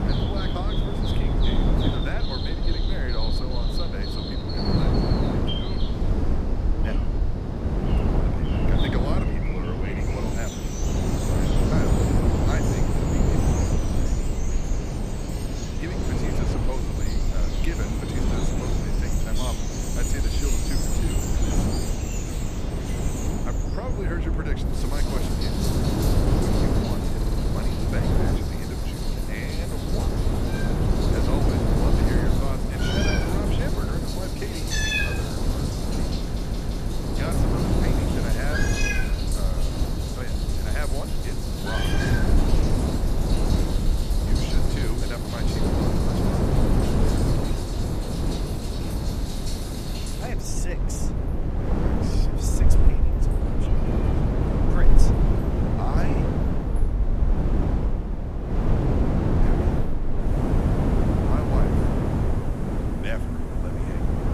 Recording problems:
animal sounds; very loud; throughout; 3 dB above the speech
wind noise on the microphone; heavy; 5 dB above the speech
low rumble; noticeable; throughout; 15 dB below the speech
audio stuttering; at 27 s and at 36 s

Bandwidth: 14.5 kHz